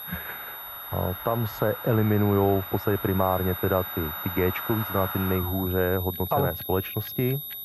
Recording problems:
muffled; very; fading above 1.5 kHz
high-pitched whine; loud; throughout; 12 kHz, 8 dB below the speech
household noises; noticeable; throughout; 15 dB below the speech

